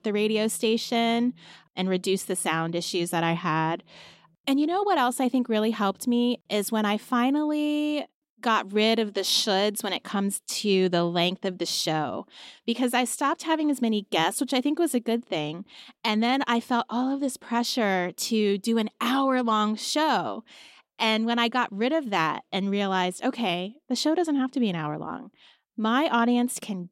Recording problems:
none

